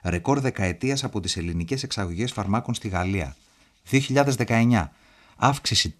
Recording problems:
none

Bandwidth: 13.5 kHz